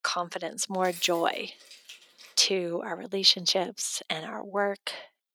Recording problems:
thin; very; fading below 350 Hz
jangling keys; faint; from 1 to 2.5 s; peak 15 dB below the speech

